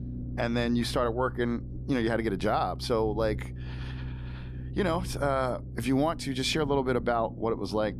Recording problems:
low rumble; faint; throughout; 20 dB below the speech

